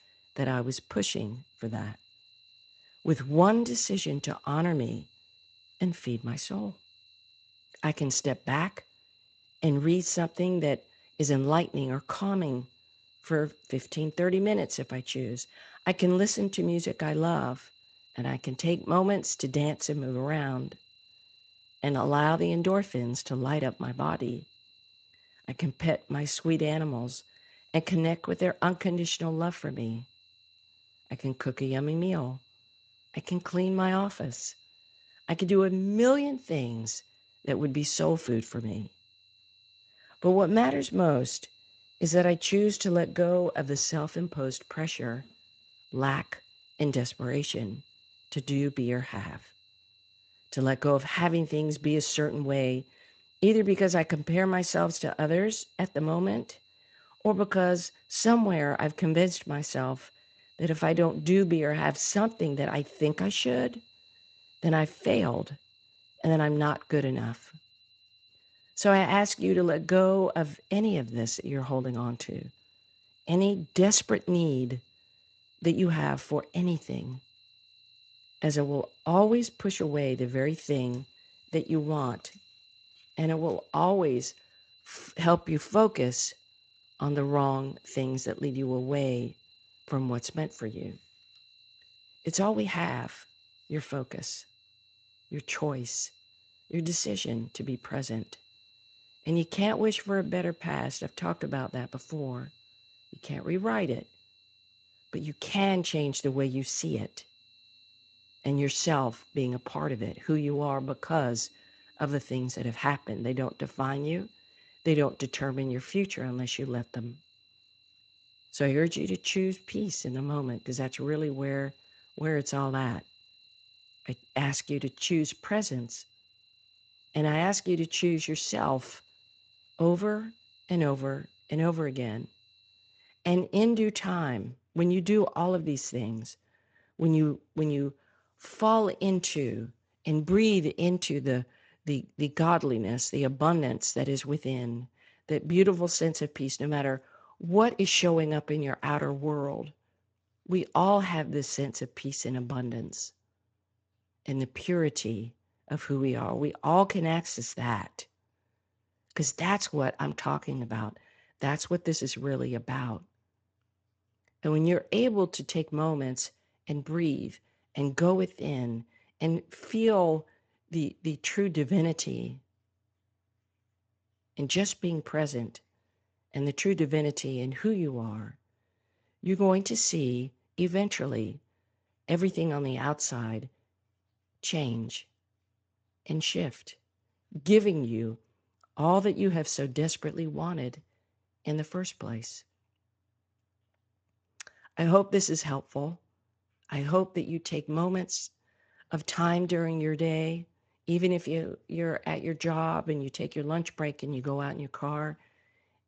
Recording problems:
garbled, watery; slightly; nothing above 7.5 kHz
high-pitched whine; faint; until 2:13; 4 kHz, 30 dB below the speech

